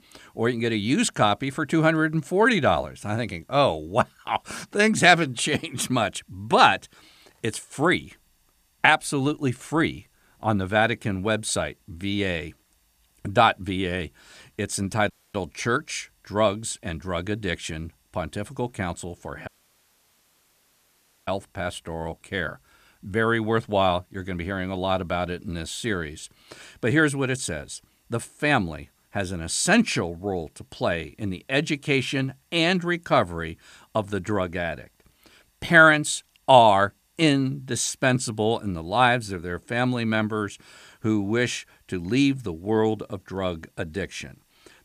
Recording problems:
audio cutting out; at 15 s and at 19 s for 2 s

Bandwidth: 14.5 kHz